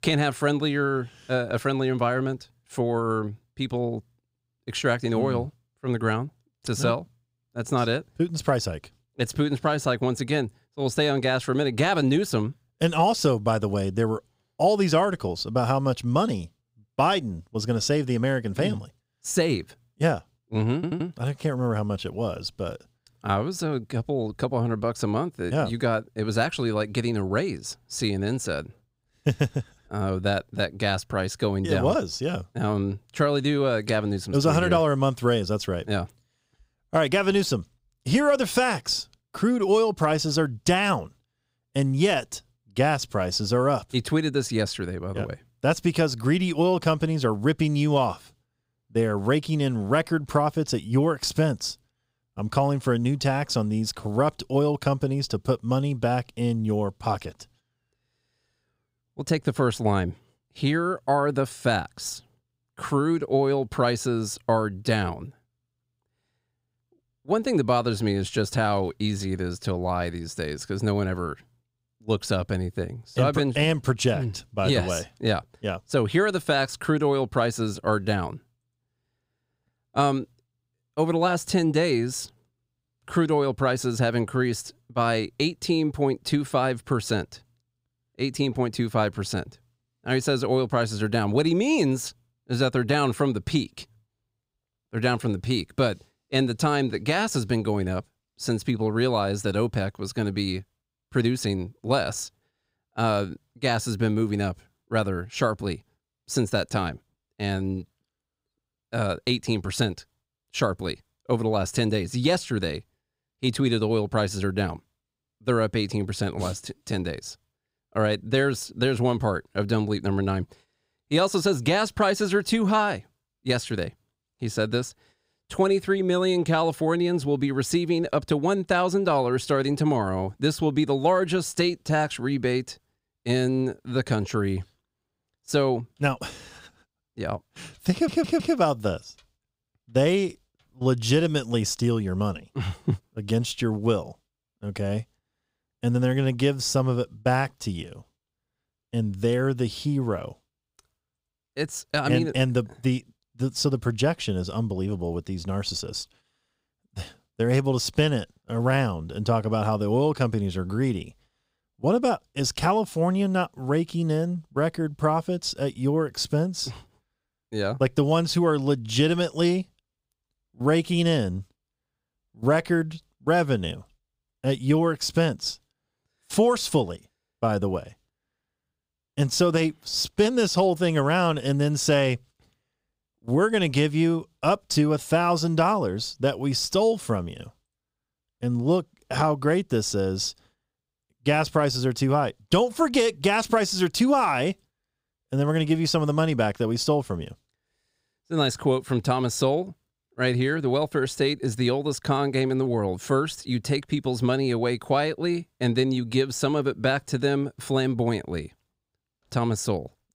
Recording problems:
audio stuttering; at 21 s and at 2:18

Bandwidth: 15.5 kHz